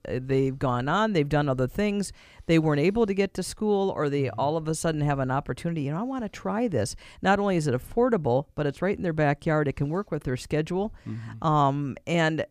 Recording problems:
none

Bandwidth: 15 kHz